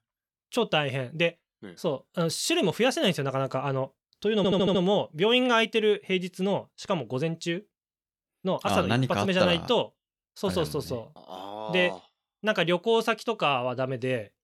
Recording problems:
audio stuttering; at 4.5 s

